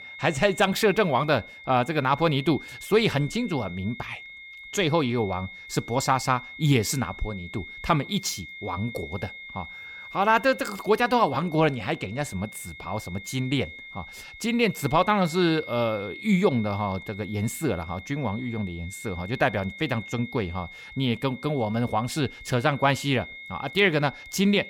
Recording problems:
high-pitched whine; noticeable; throughout; 2 kHz, 15 dB below the speech

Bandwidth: 17 kHz